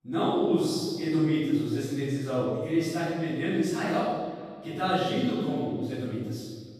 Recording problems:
room echo; strong; dies away in 1.4 s
off-mic speech; far
echo of what is said; faint; throughout; 430 ms later, 20 dB below the speech

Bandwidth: 14.5 kHz